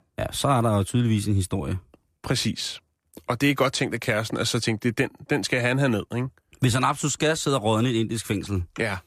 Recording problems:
none

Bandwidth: 14.5 kHz